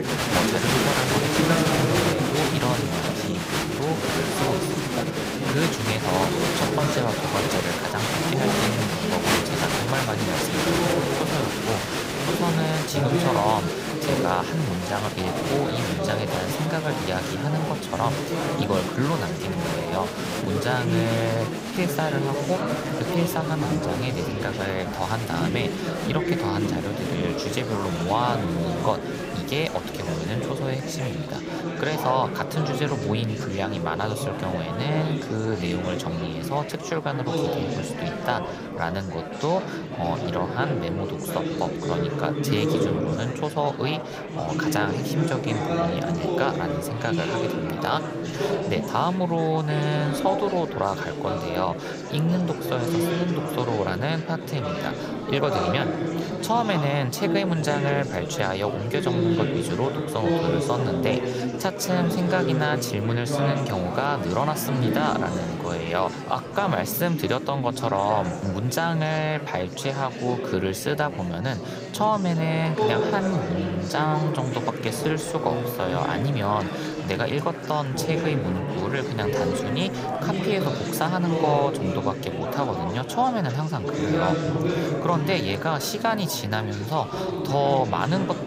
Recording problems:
chatter from many people; very loud; throughout; as loud as the speech

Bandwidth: 15.5 kHz